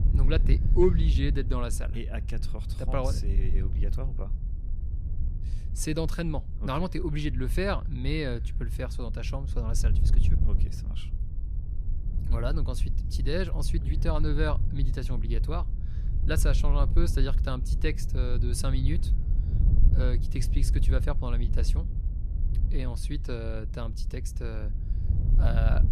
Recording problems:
wind noise on the microphone; occasional gusts; 10 dB below the speech

